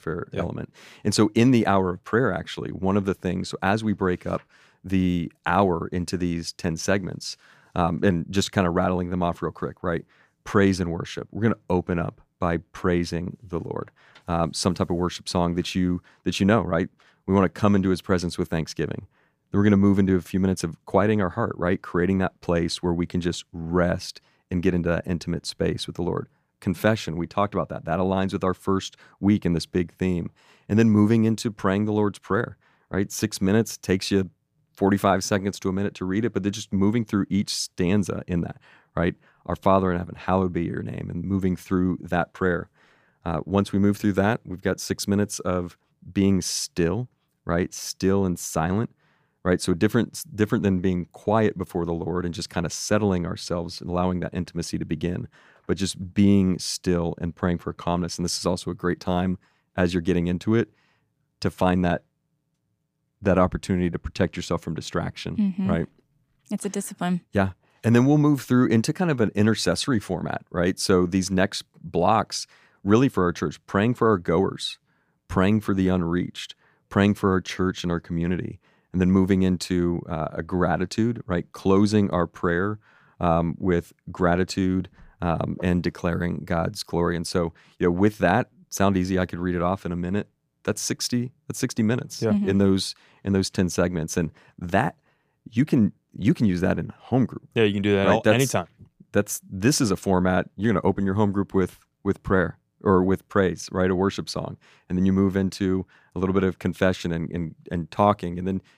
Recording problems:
none

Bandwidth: 15 kHz